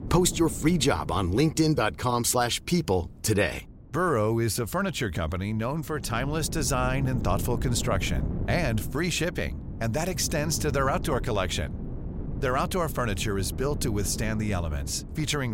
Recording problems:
wind noise on the microphone; occasional gusts; 15 dB below the speech
abrupt cut into speech; at the end

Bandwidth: 16 kHz